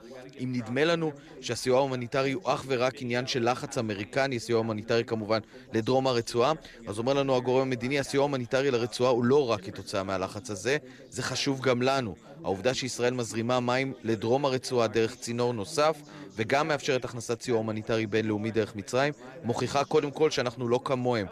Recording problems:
background chatter; noticeable; throughout; 3 voices, 20 dB below the speech

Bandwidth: 14 kHz